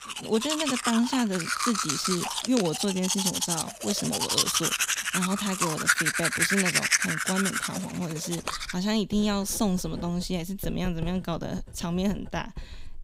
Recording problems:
household noises; very loud; throughout; 3 dB above the speech

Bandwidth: 15.5 kHz